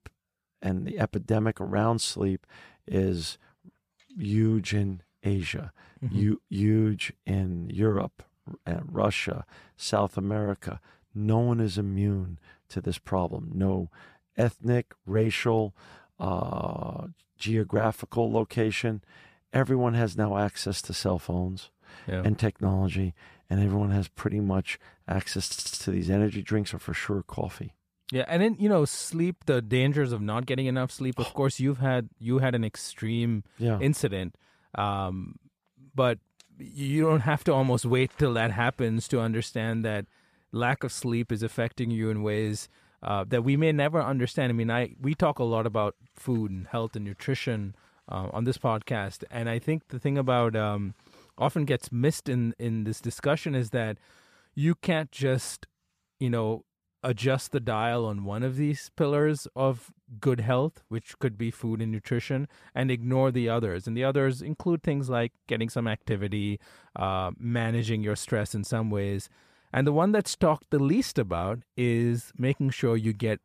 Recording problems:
audio stuttering; at 25 s

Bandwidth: 14.5 kHz